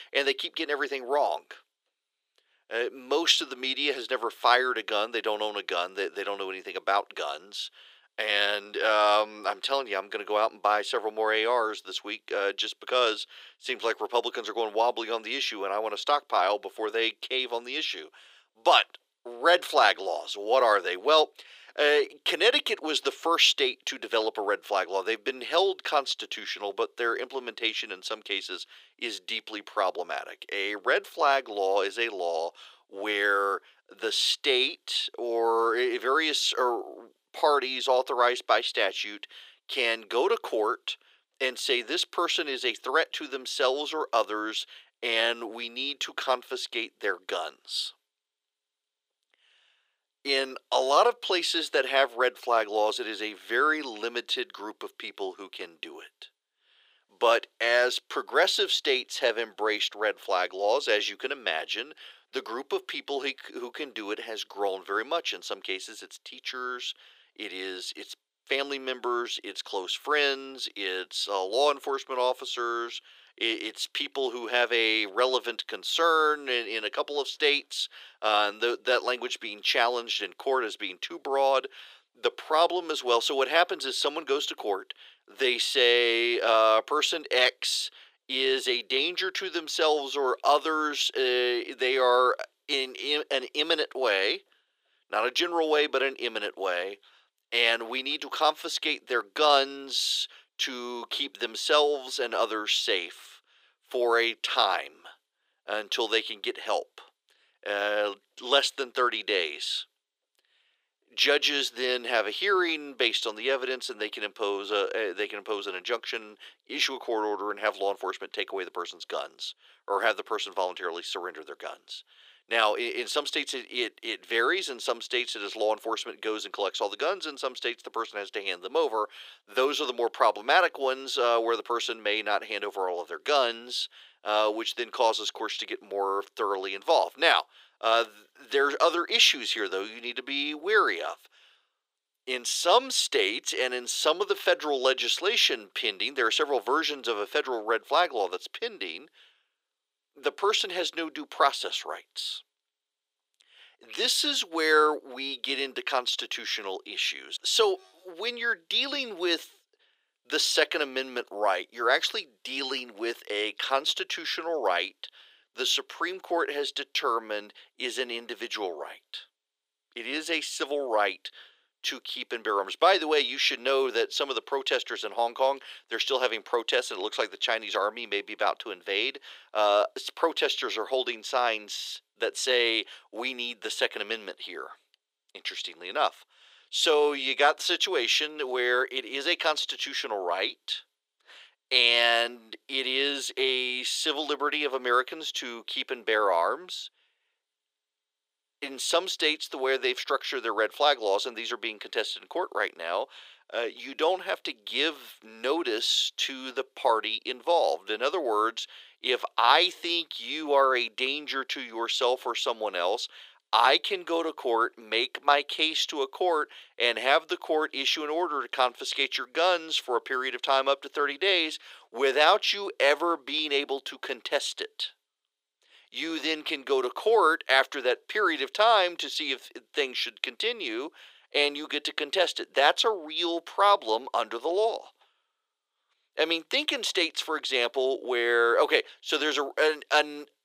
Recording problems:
thin; very; fading below 400 Hz

